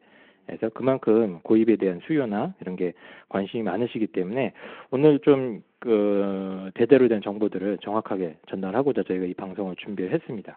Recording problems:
phone-call audio

